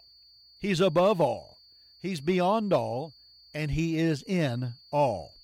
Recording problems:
high-pitched whine; faint; throughout; 4.5 kHz, 25 dB below the speech

